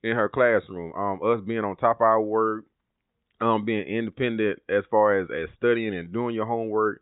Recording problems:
high frequencies cut off; severe; nothing above 4 kHz

